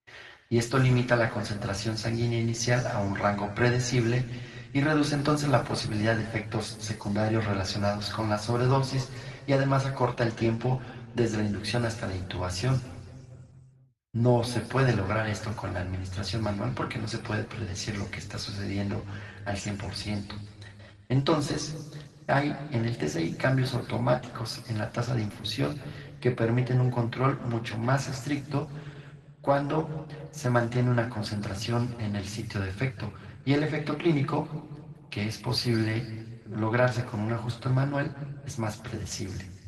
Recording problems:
room echo; slight; dies away in 1.6 s
off-mic speech; somewhat distant
garbled, watery; slightly; nothing above 12 kHz

